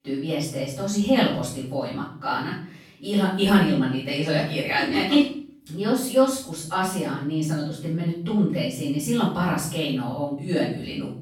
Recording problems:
off-mic speech; far
room echo; noticeable; dies away in 0.5 s

